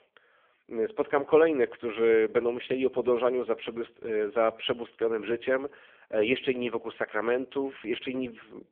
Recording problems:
phone-call audio; poor line; nothing above 3.5 kHz

